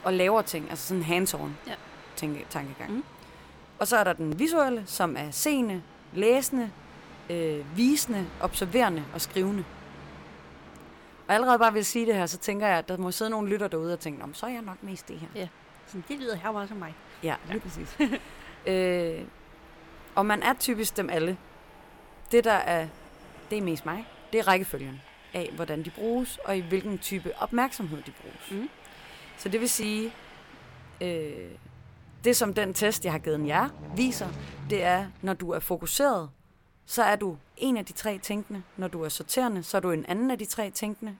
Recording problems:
train or aircraft noise; noticeable; throughout; 20 dB below the speech

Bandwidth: 17.5 kHz